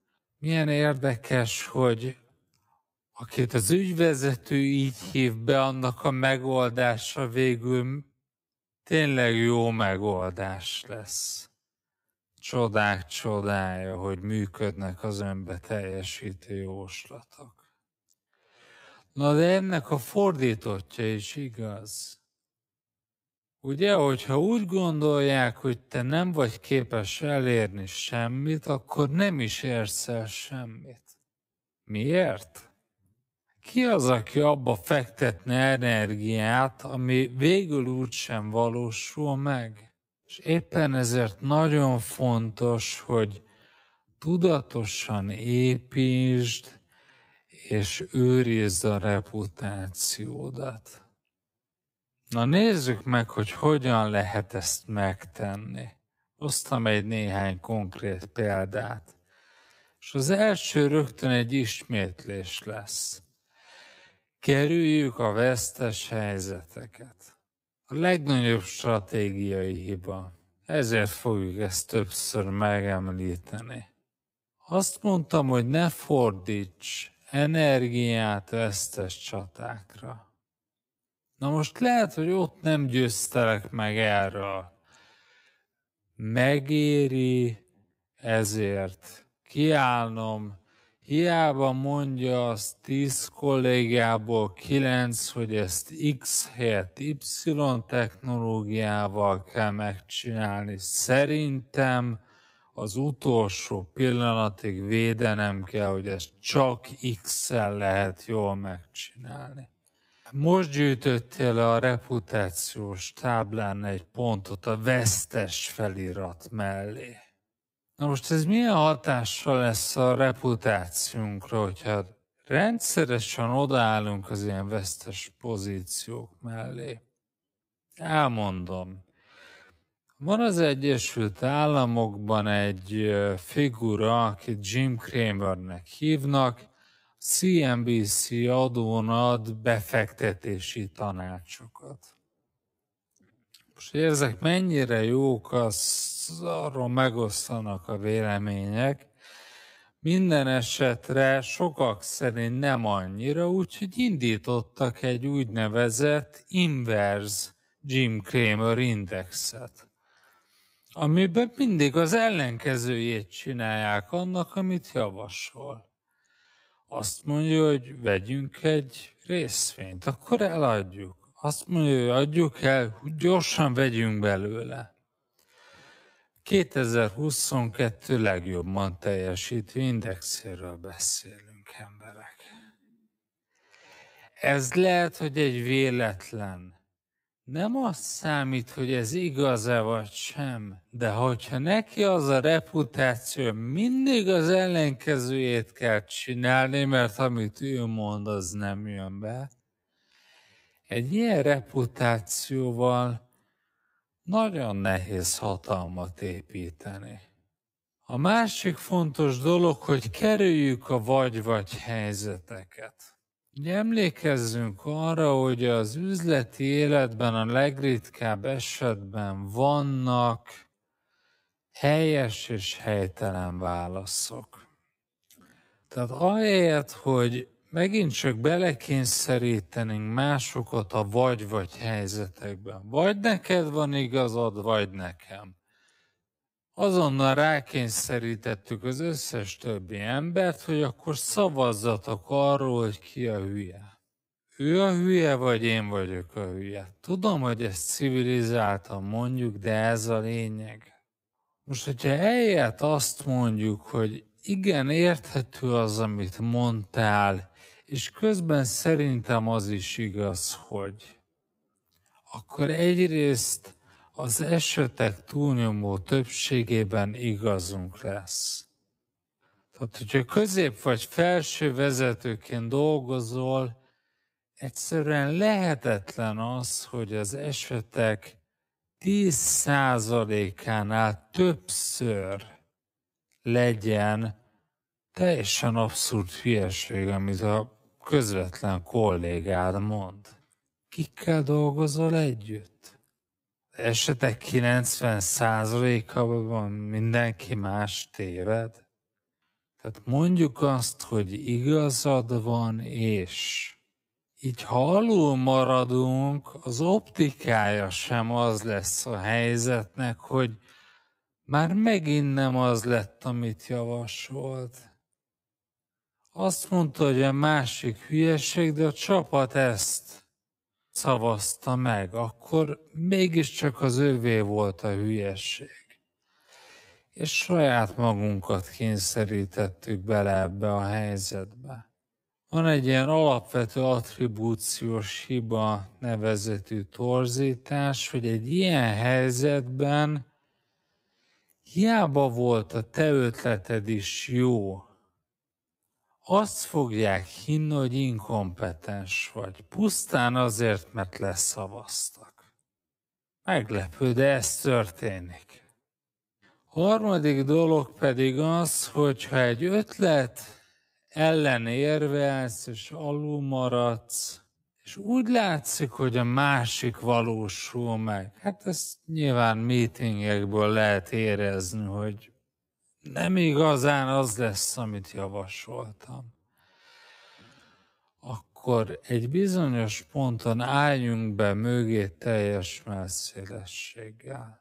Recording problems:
wrong speed, natural pitch; too slow; 0.5 times normal speed

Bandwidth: 15.5 kHz